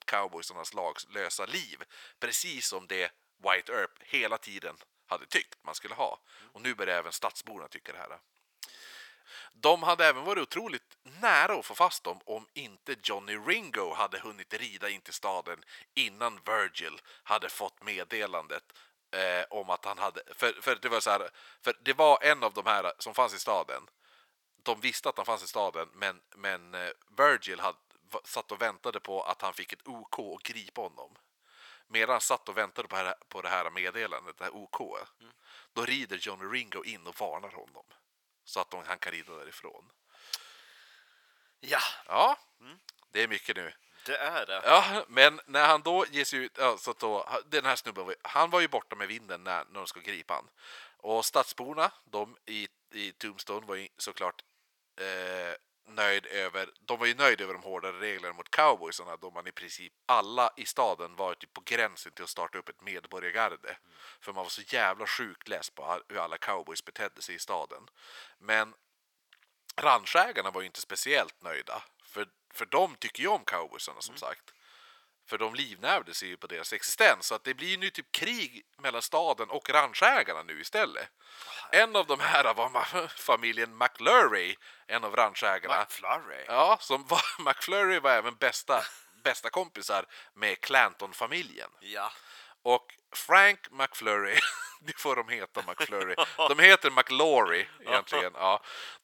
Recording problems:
thin; very; fading below 1 kHz

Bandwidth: 18 kHz